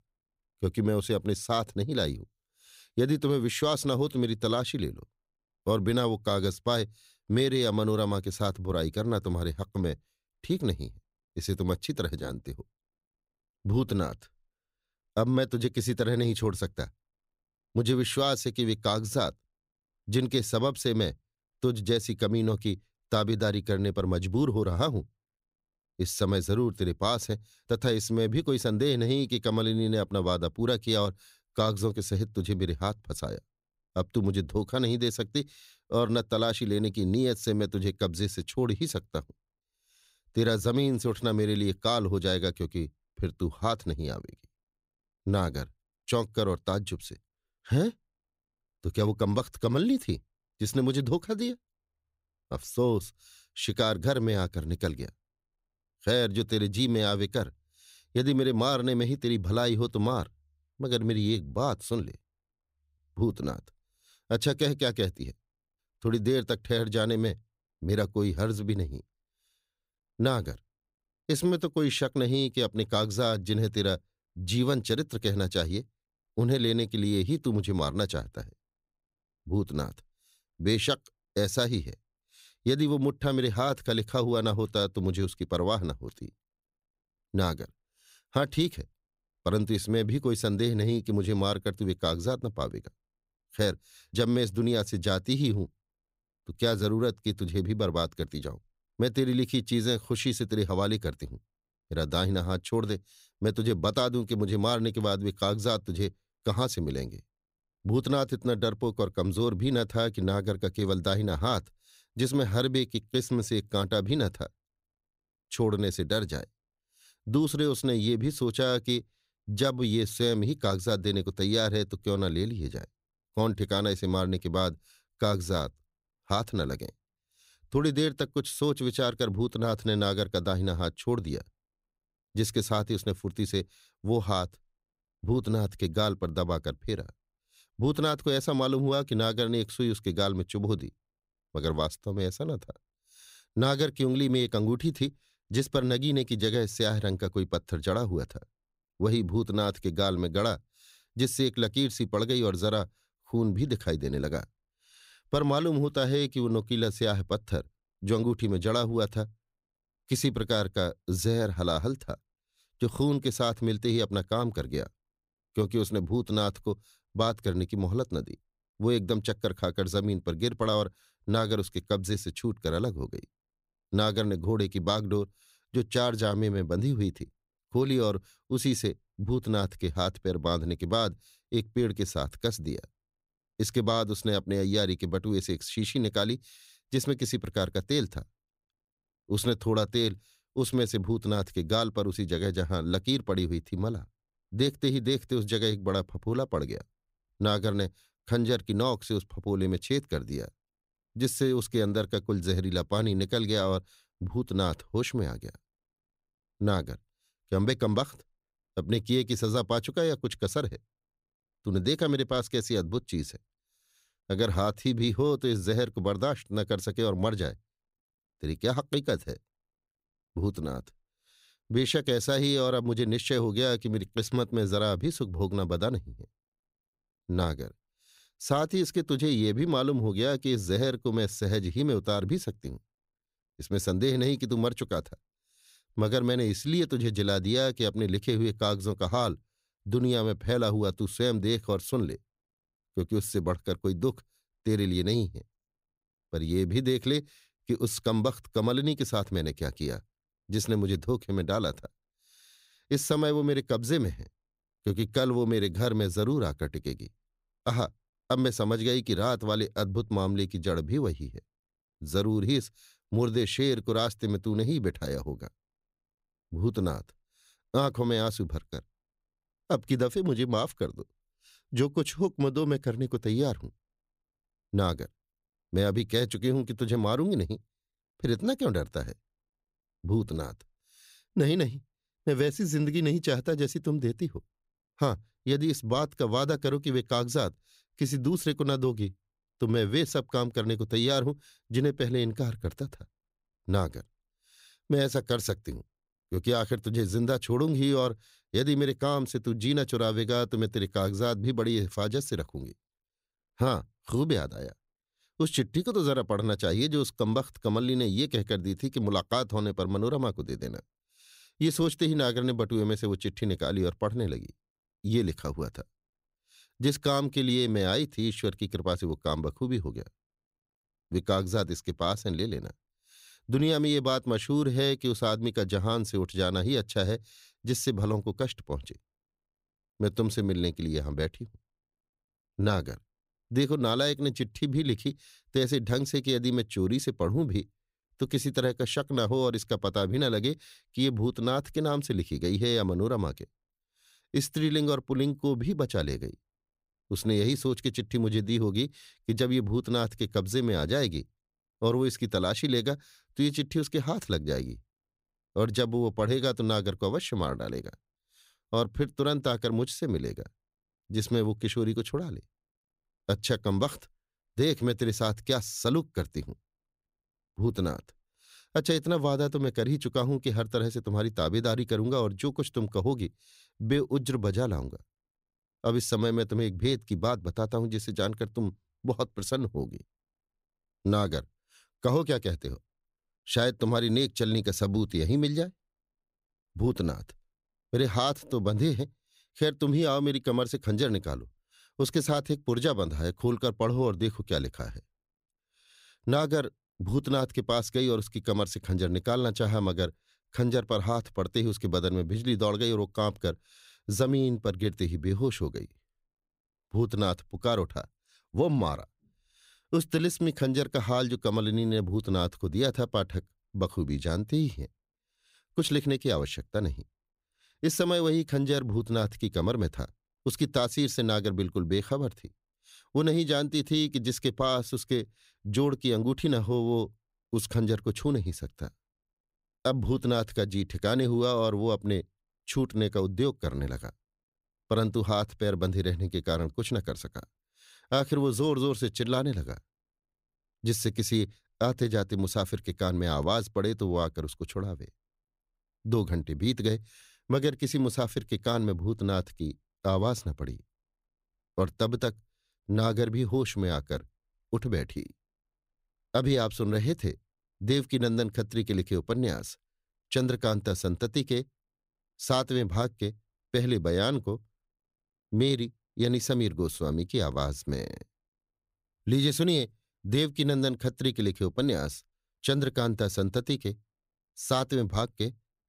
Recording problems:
none

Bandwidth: 15.5 kHz